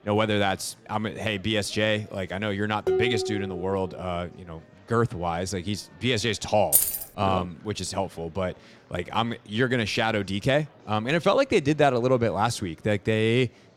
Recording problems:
murmuring crowd; faint; throughout; 30 dB below the speech
clattering dishes; loud; at 3 s; peak 1 dB above the speech
jangling keys; loud; at 6.5 s; peak 6 dB above the speech

